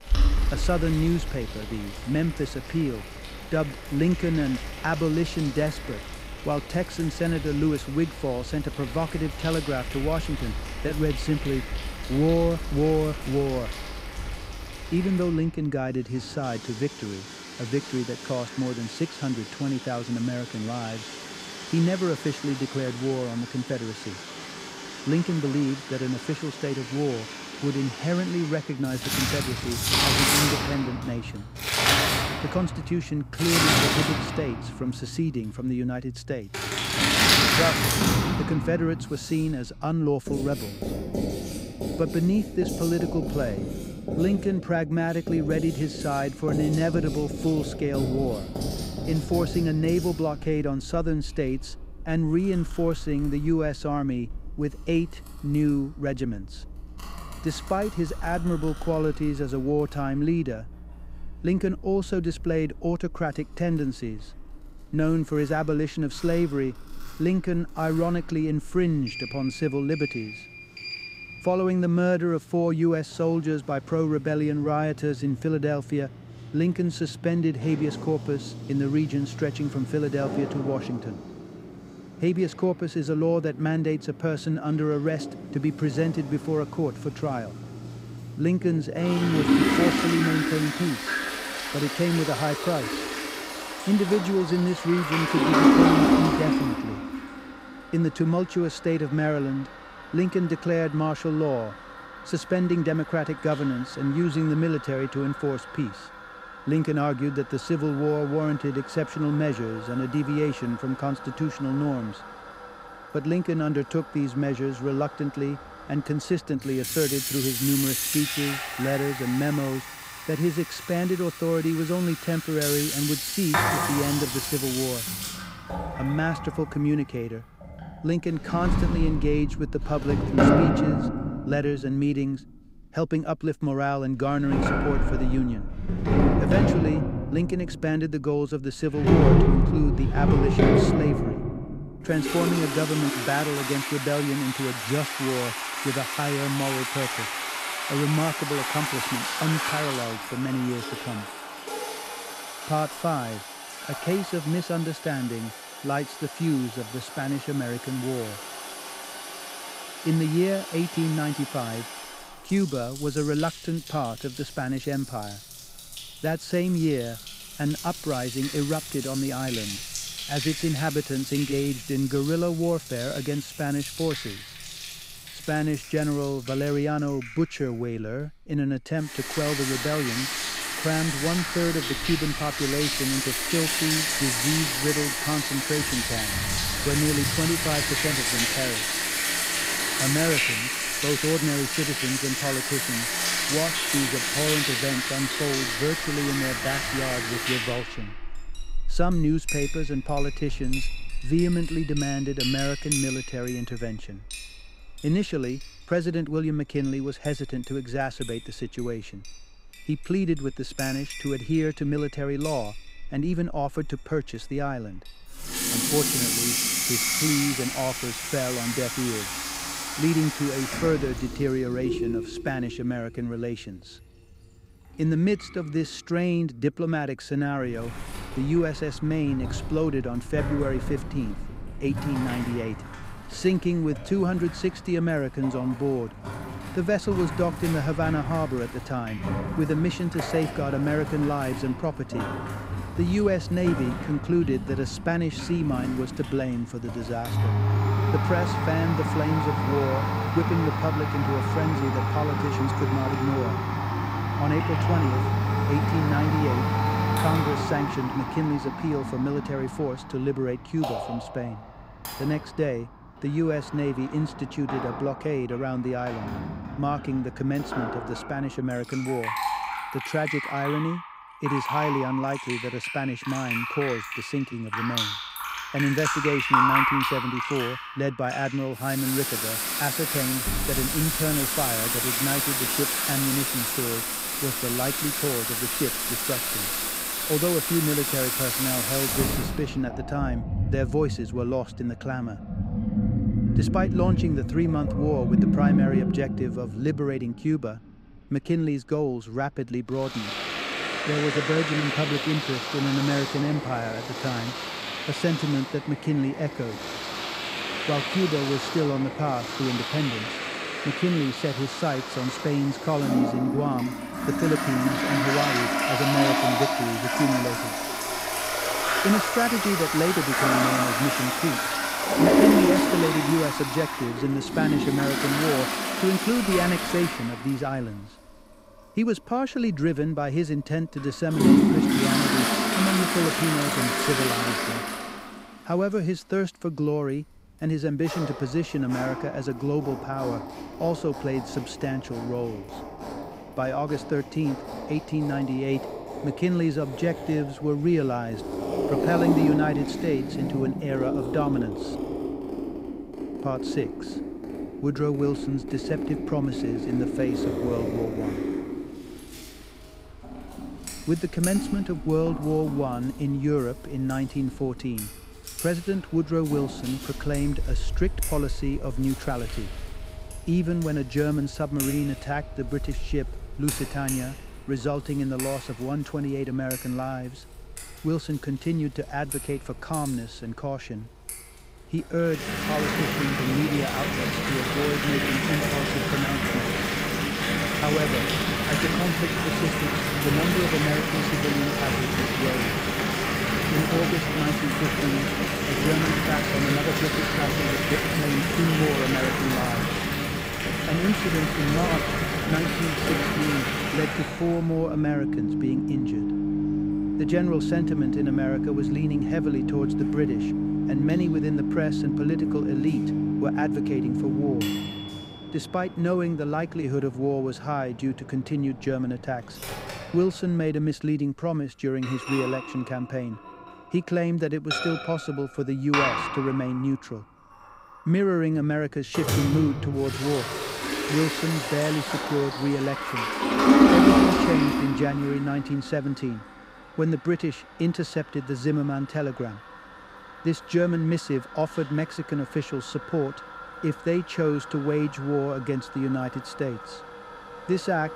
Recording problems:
household noises; very loud; throughout; as loud as the speech

